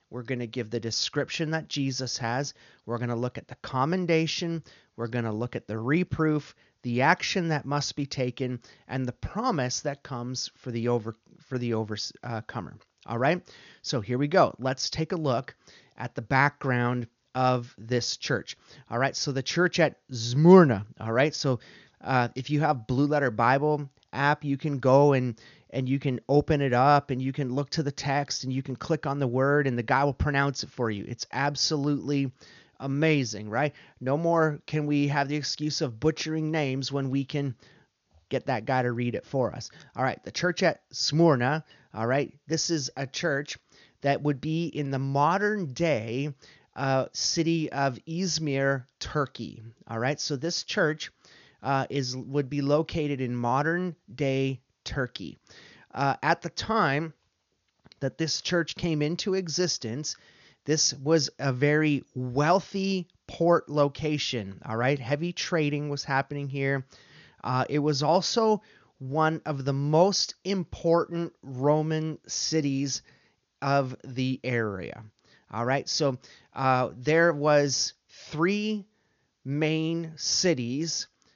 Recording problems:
high frequencies cut off; noticeable; nothing above 7 kHz

